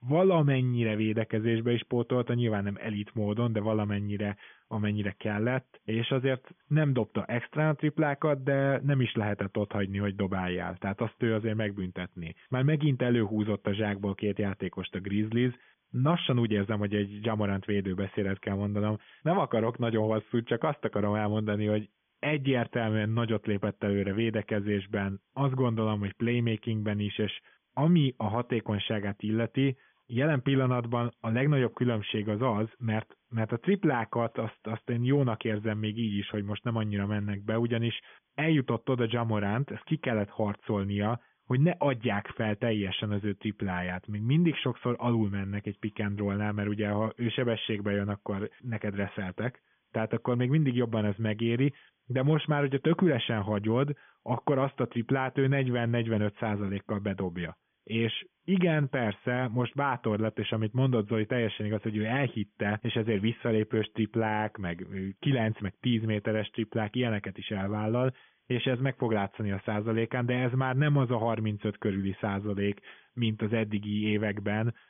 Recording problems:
high frequencies cut off; severe; nothing above 3.5 kHz
hiss; very faint; throughout; 45 dB below the speech

